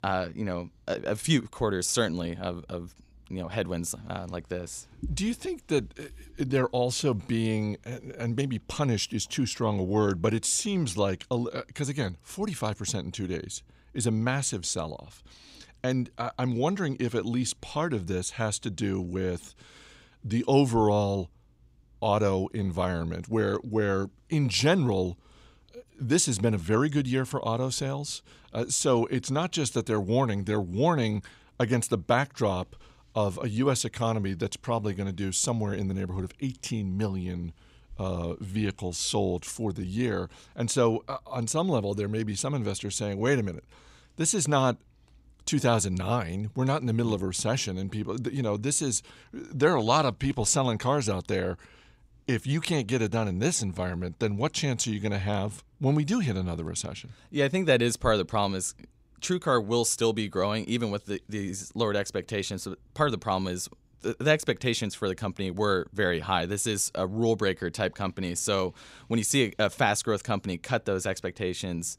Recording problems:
none

